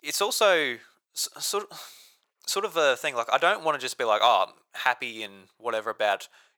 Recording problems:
thin; very; fading below 800 Hz

